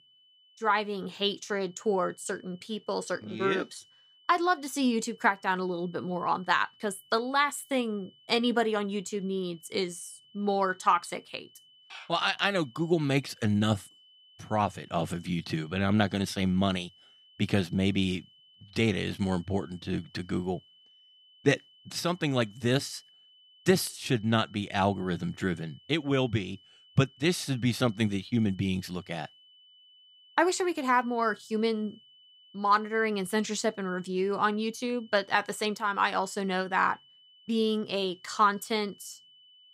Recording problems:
high-pitched whine; faint; throughout; 3 kHz, 25 dB below the speech

